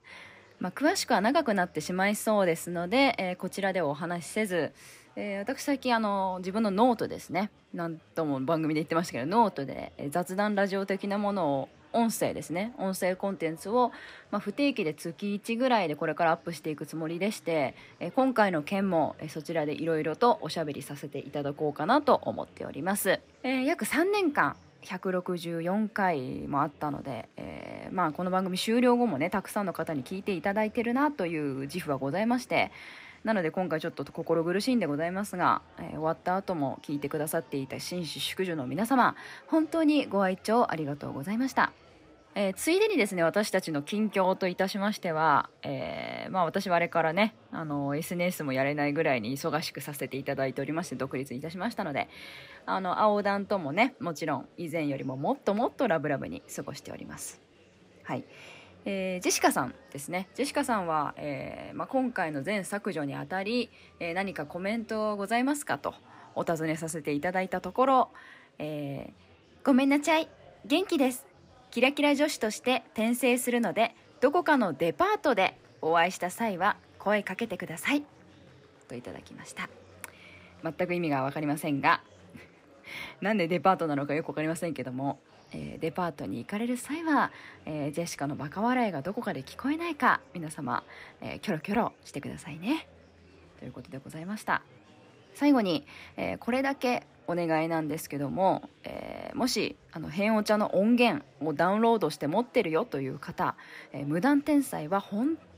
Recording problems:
murmuring crowd; faint; throughout; 25 dB below the speech

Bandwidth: 15.5 kHz